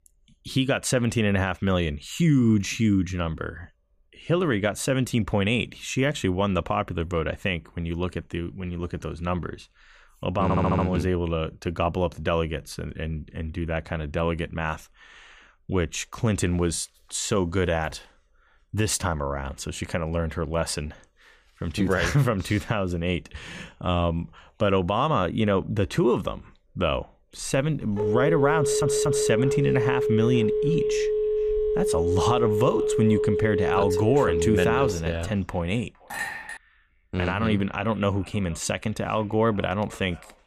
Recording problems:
echo of what is said; faint; from 29 s on; 460 ms later, 25 dB below the speech
audio stuttering; at 10 s and at 29 s
phone ringing; loud; from 27 to 35 s; peak 1 dB above the speech
clattering dishes; noticeable; at 36 s; peak 5 dB below the speech

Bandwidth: 15 kHz